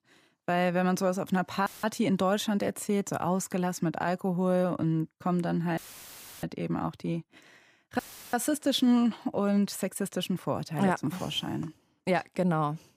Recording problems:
audio cutting out; filled with static; at 1.5 s, at 6 s for 0.5 s and at 8 s

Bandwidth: 15 kHz